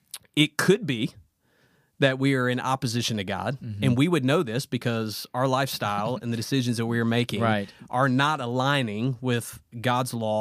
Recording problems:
abrupt cut into speech; at the end

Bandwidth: 15 kHz